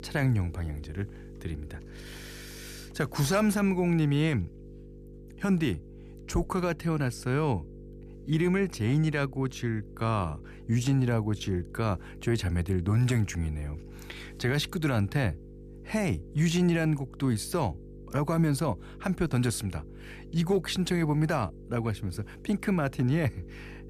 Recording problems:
electrical hum; faint; throughout; 50 Hz, 20 dB below the speech

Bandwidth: 14.5 kHz